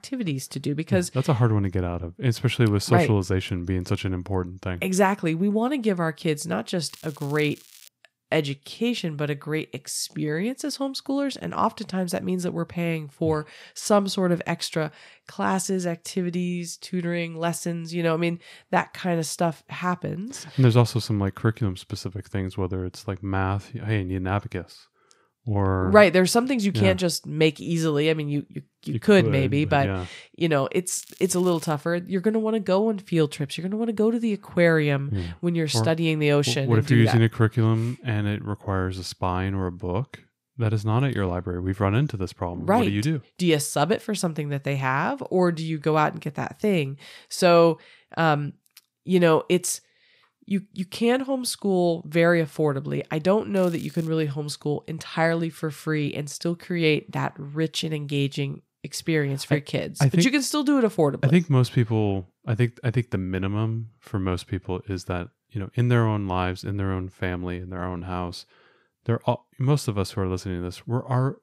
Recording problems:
crackling; faint; at 7 s, at 31 s and at 54 s; 25 dB below the speech

